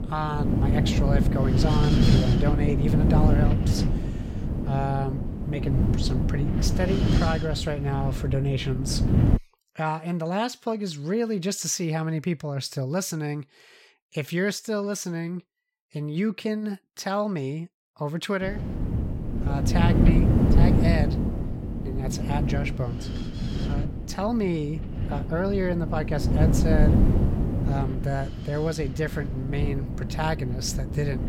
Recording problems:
wind noise on the microphone; heavy; until 9.5 s and from 18 s on; 2 dB below the speech

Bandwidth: 16.5 kHz